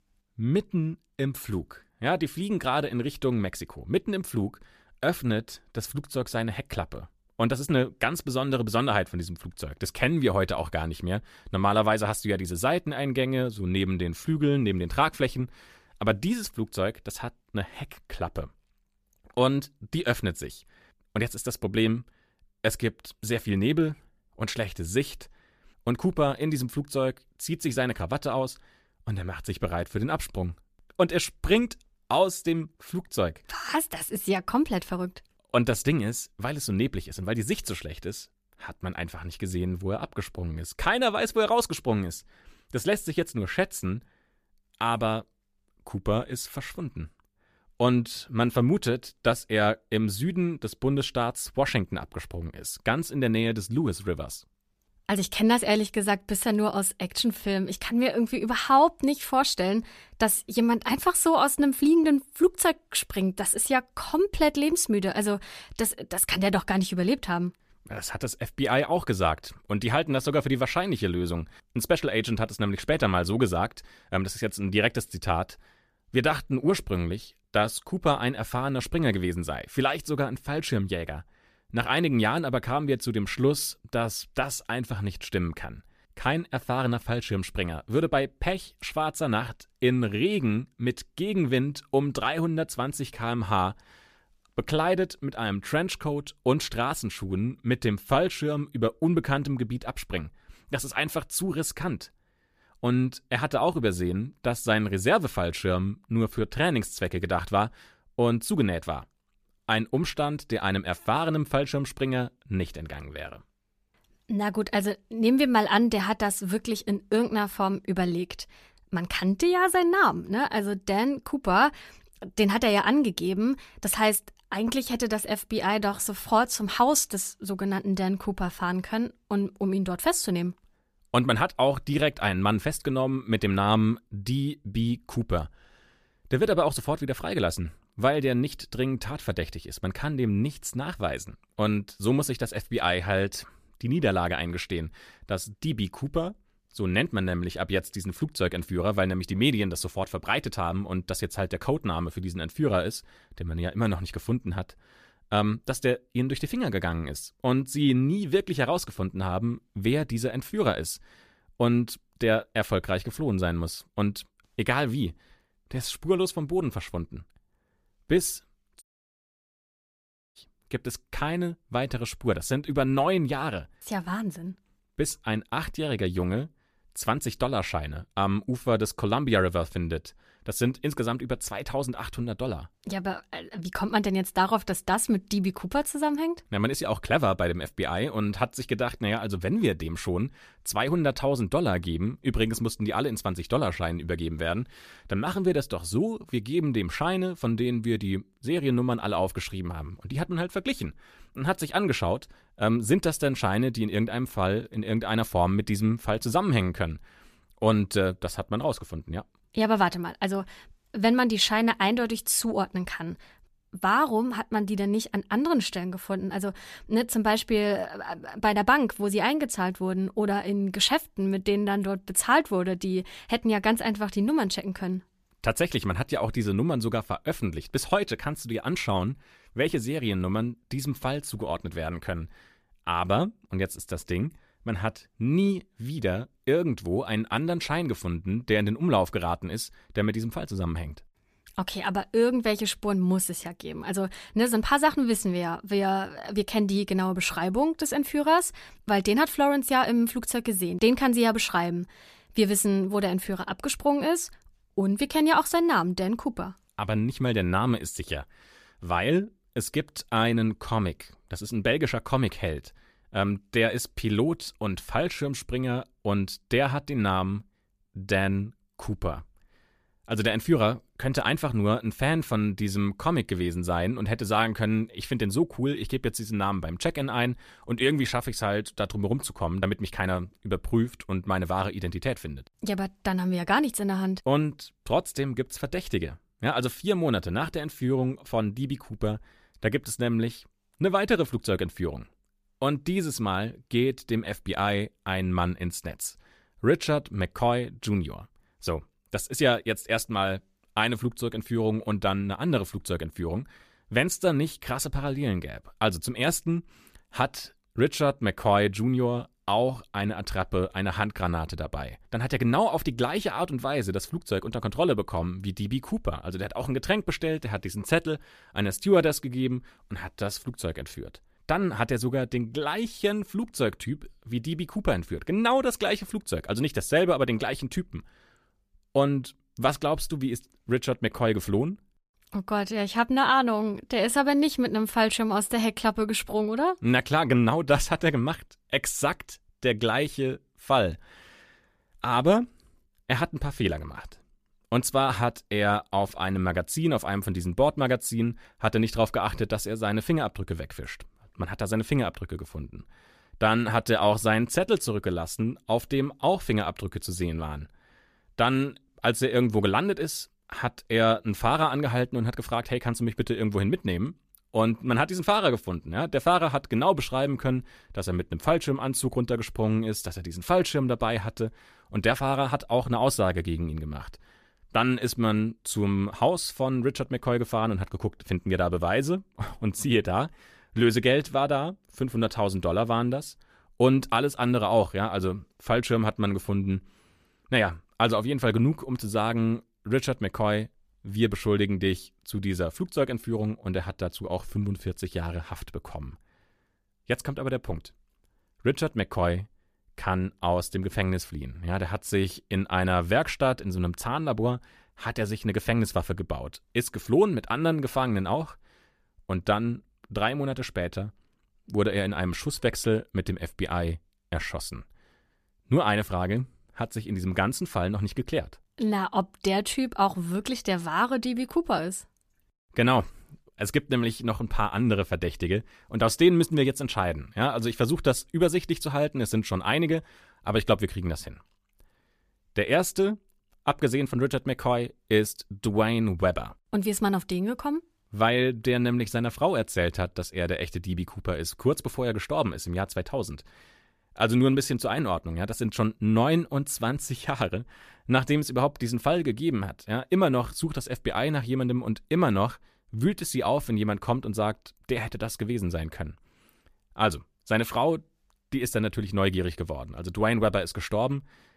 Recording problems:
audio cutting out; at 2:49 for 1.5 s

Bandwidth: 14.5 kHz